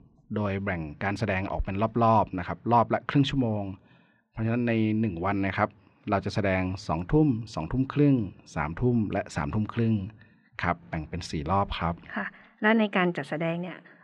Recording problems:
muffled; slightly; fading above 2.5 kHz

